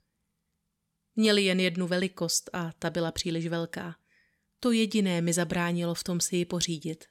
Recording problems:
none

